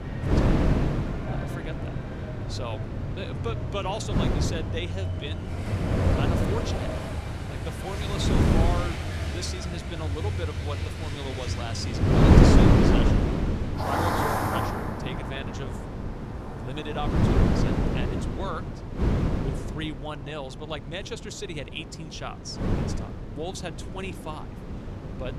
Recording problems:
traffic noise; very loud; throughout; 3 dB above the speech
wind noise on the microphone; heavy; 4 dB above the speech

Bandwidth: 15 kHz